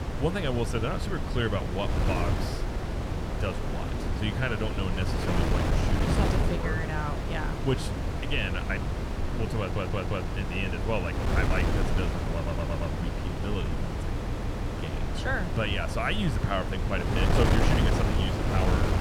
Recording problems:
wind noise on the microphone; heavy; 1 dB below the speech
audio stuttering; at 9.5 s, at 12 s and at 14 s

